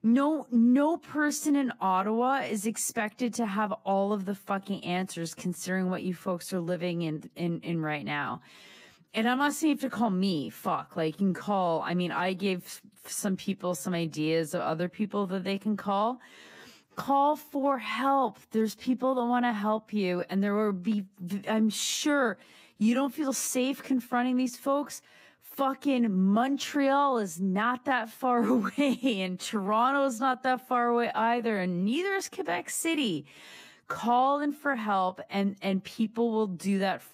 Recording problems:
wrong speed, natural pitch; too slow; 0.6 times normal speed

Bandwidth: 15.5 kHz